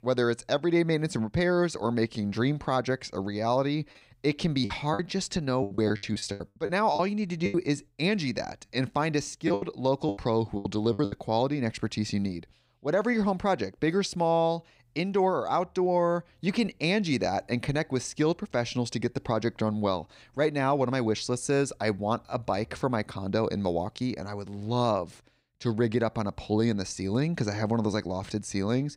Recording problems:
choppy; very; from 4.5 to 7.5 s and from 9.5 to 11 s; 15% of the speech affected

